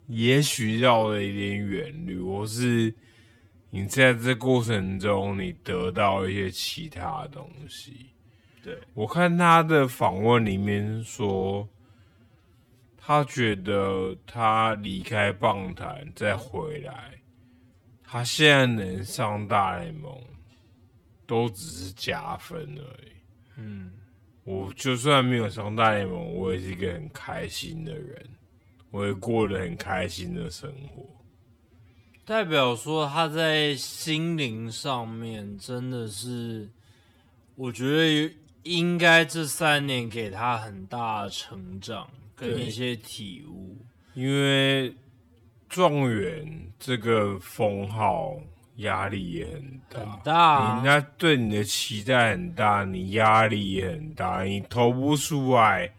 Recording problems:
wrong speed, natural pitch; too slow; 0.5 times normal speed

